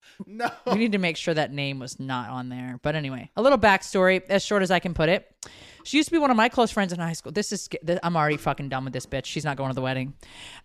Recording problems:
none

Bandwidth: 15 kHz